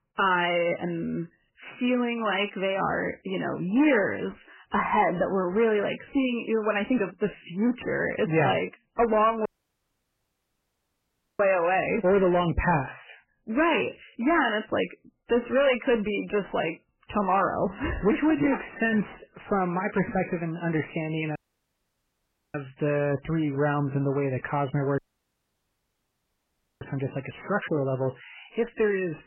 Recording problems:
garbled, watery; badly; nothing above 3 kHz
distortion; slight; 10 dB below the speech
audio cutting out; at 9.5 s for 2 s, at 21 s for 1 s and at 25 s for 2 s

